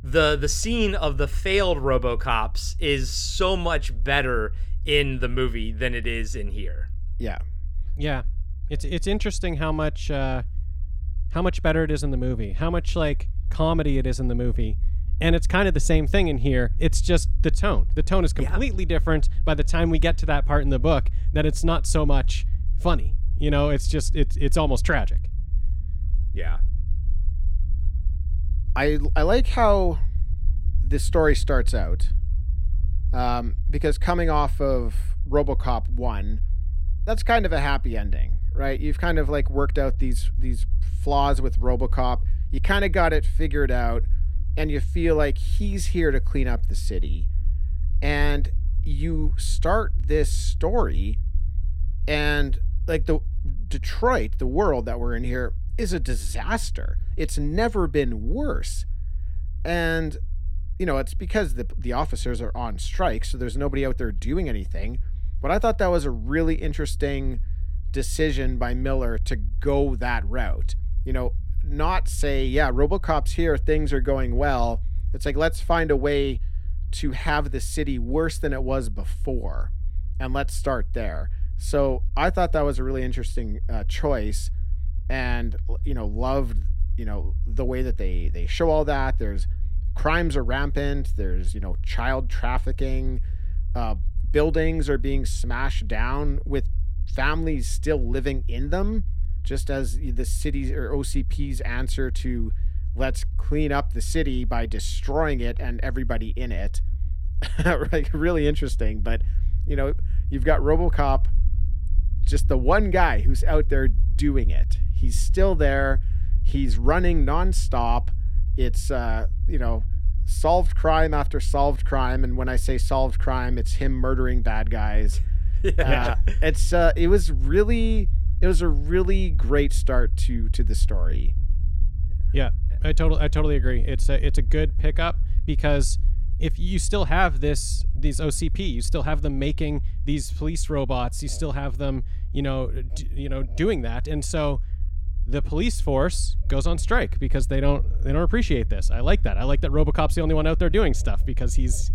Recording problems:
low rumble; faint; throughout; 25 dB below the speech

